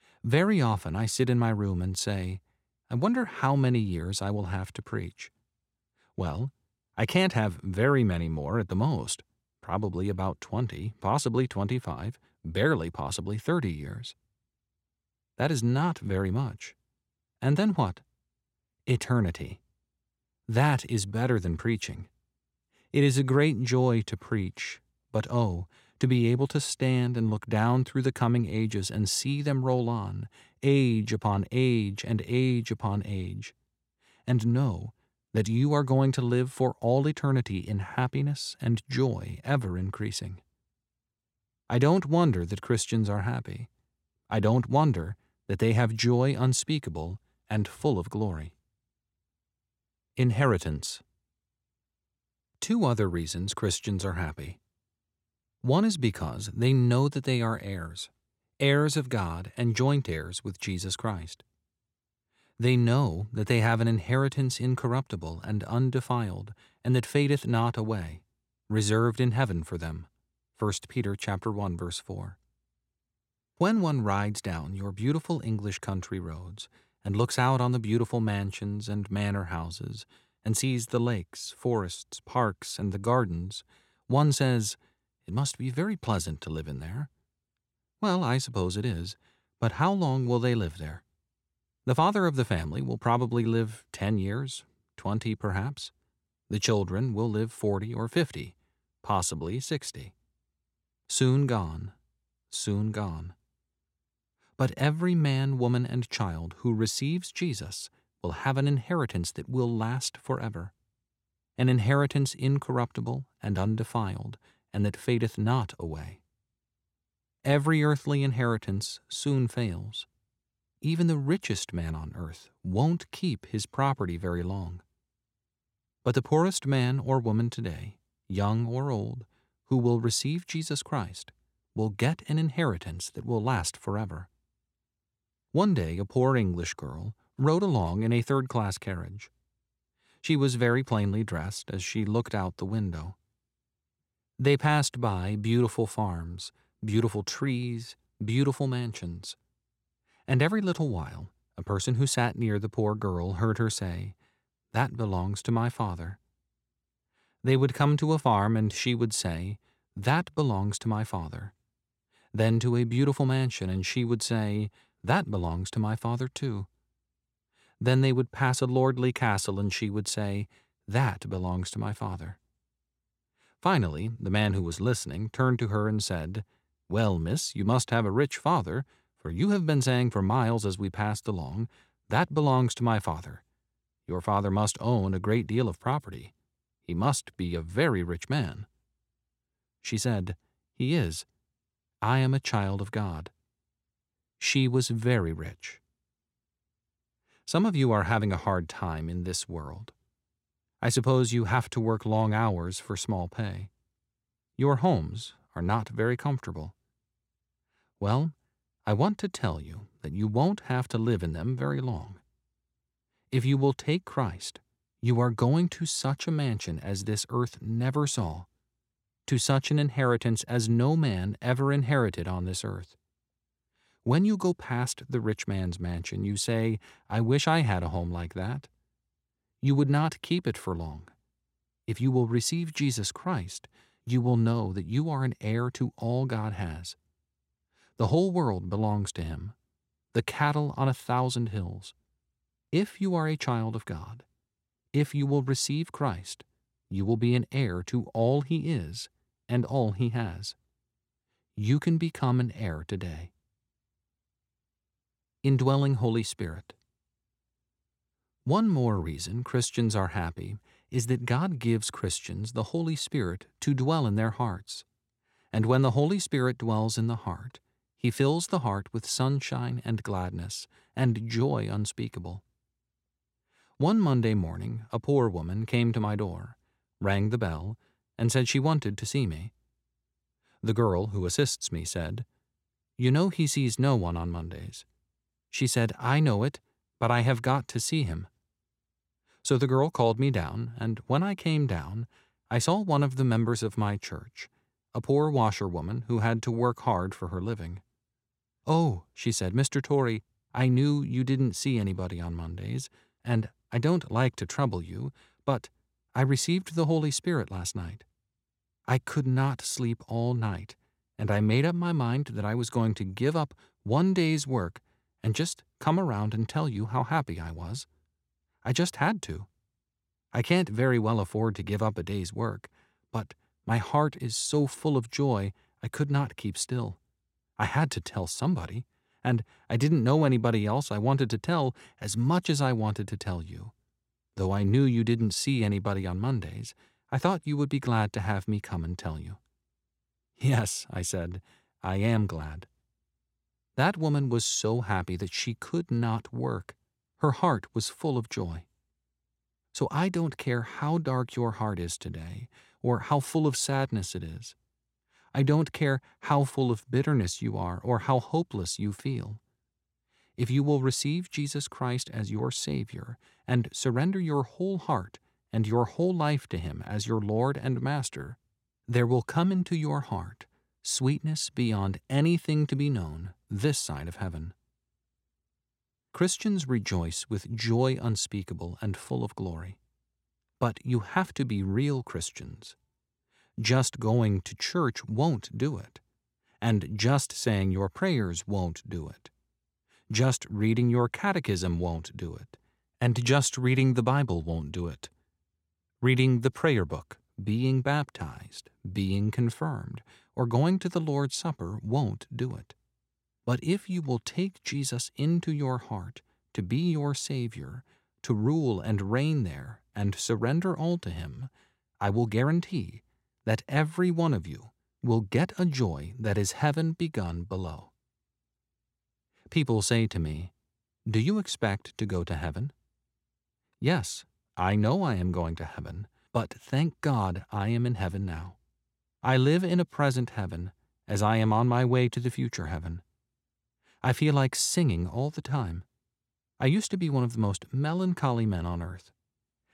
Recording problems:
none

